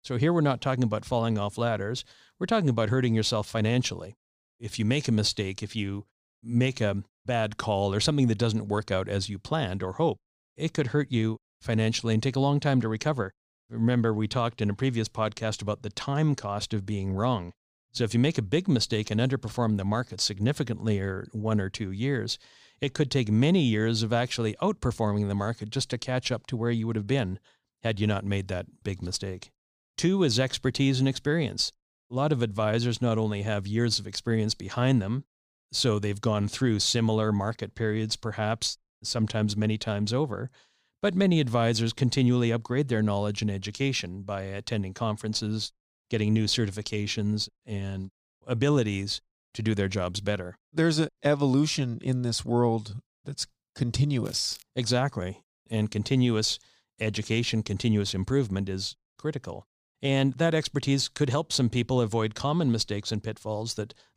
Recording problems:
crackling; faint; at 54 s; 20 dB below the speech

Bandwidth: 15 kHz